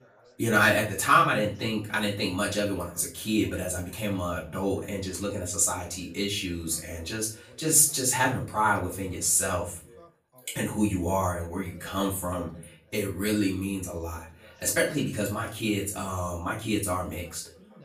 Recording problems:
off-mic speech; far
room echo; slight; dies away in 0.3 s
background chatter; faint; throughout; 3 voices, 30 dB below the speech

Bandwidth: 14.5 kHz